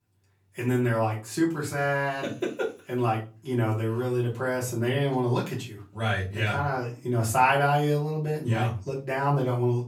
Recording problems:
off-mic speech; far
room echo; slight; dies away in 0.3 s

